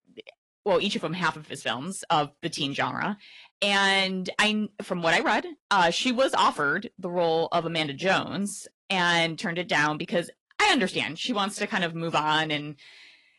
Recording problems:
distortion; slight; 10 dB below the speech
garbled, watery; slightly; nothing above 11 kHz

